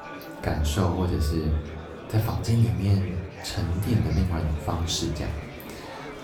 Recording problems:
room echo; slight; dies away in 0.4 s
off-mic speech; somewhat distant
murmuring crowd; noticeable; throughout; 15 dB below the speech
background music; faint; throughout; 20 dB below the speech

